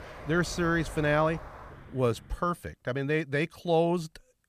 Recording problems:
traffic noise; noticeable; until 2 s; 15 dB below the speech

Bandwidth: 14.5 kHz